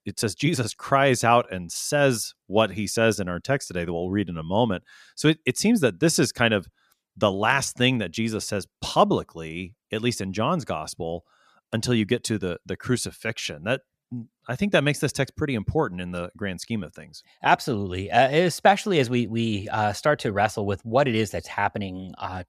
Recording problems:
none

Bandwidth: 14.5 kHz